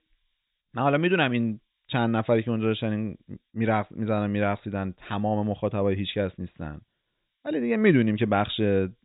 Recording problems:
high frequencies cut off; severe; nothing above 4 kHz
hiss; very faint; throughout; 50 dB below the speech

